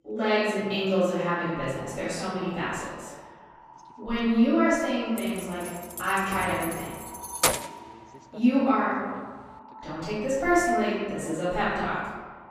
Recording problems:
room echo; strong; dies away in 1.4 s
off-mic speech; far
echo of what is said; faint; throughout; 260 ms later, 25 dB below the speech
voice in the background; faint; throughout; 25 dB below the speech
jangling keys; loud; from 5 to 7.5 s; peak 3 dB above the speech

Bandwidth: 15 kHz